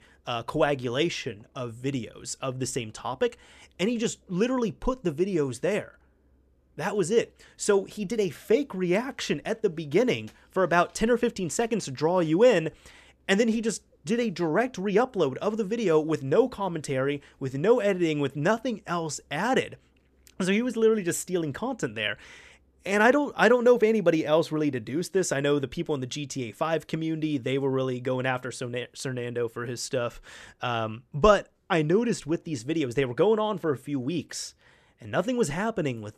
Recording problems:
none

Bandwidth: 14.5 kHz